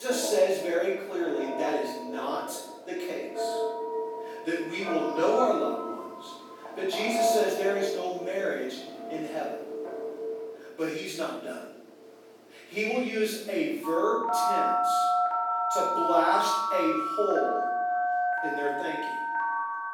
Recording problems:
off-mic speech; far
room echo; noticeable; dies away in 0.7 s
thin; somewhat; fading below 300 Hz
alarms or sirens; loud; throughout; as loud as the speech
abrupt cut into speech; at the start

